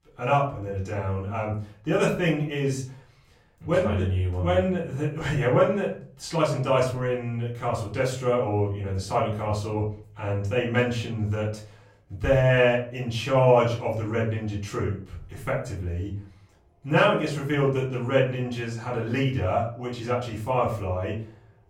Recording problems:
off-mic speech; far
room echo; slight; dies away in 0.4 s

